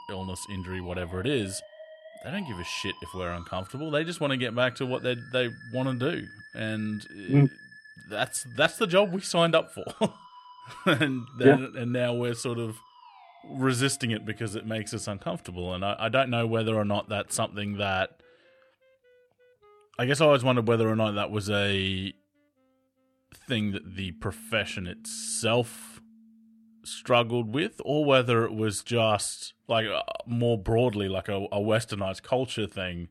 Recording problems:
background music; faint; throughout; 20 dB below the speech

